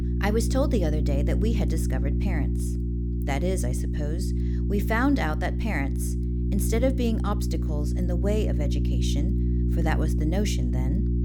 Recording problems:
electrical hum; loud; throughout; 60 Hz, 6 dB below the speech

